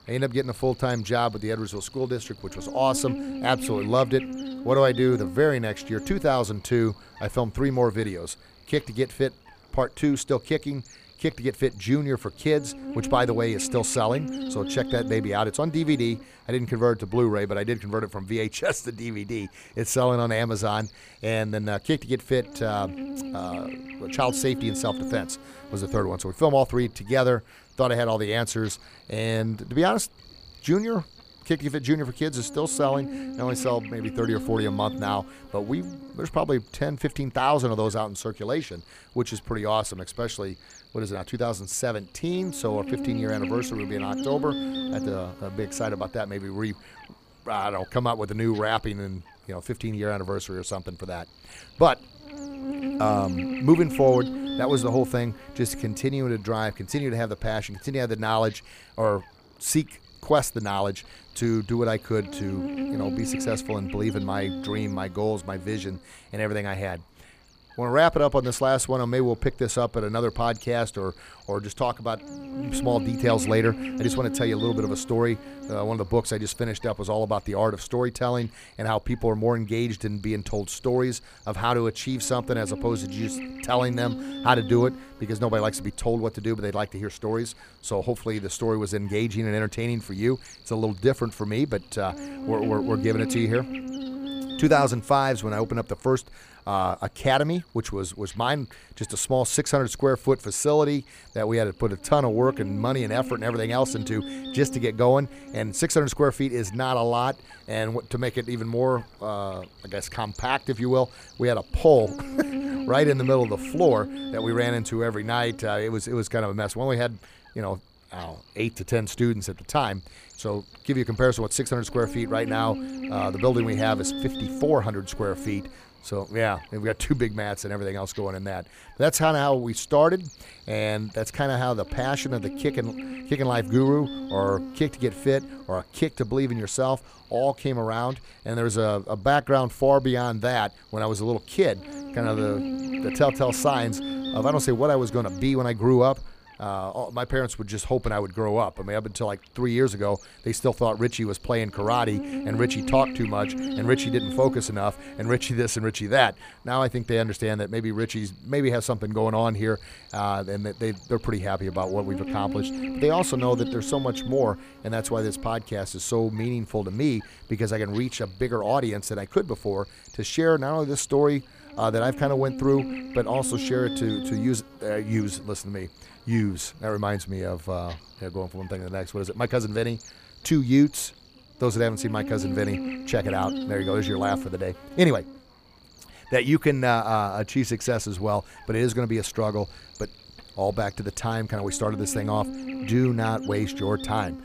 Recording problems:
electrical hum; noticeable; throughout; 60 Hz, 15 dB below the speech

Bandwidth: 15 kHz